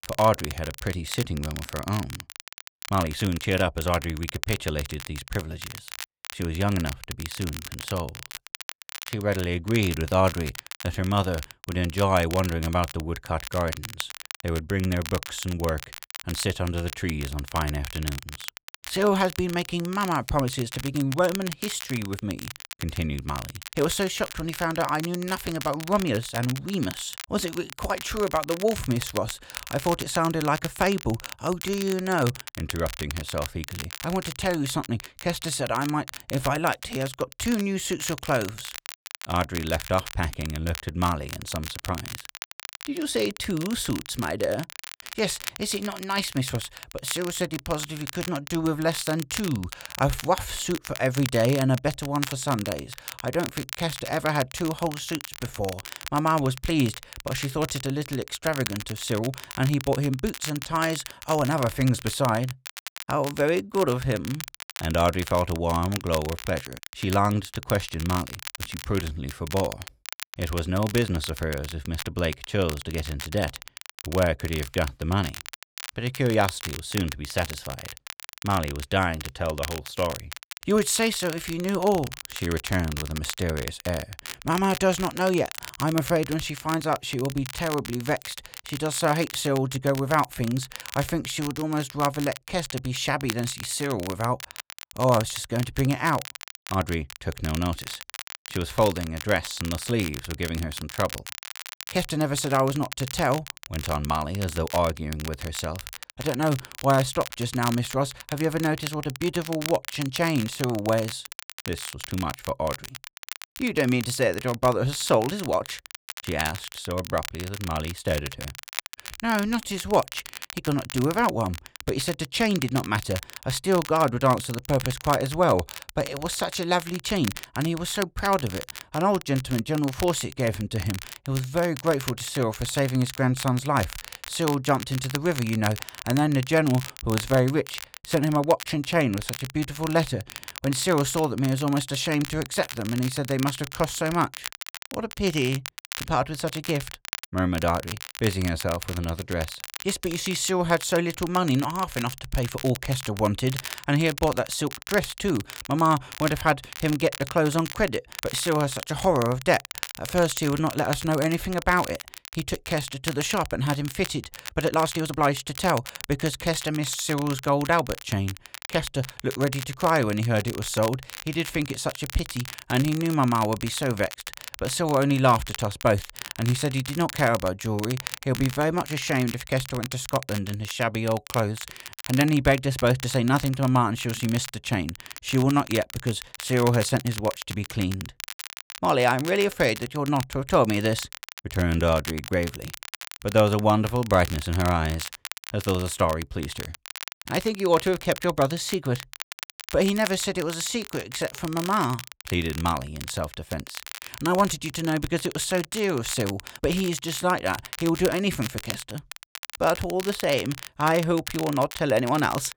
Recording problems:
crackle, like an old record; noticeable; 10 dB below the speech
uneven, jittery; strongly; from 3 s to 2:45

